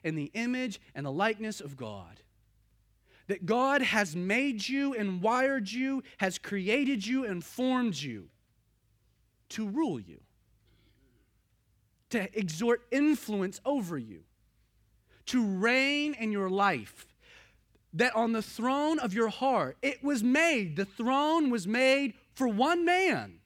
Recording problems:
none

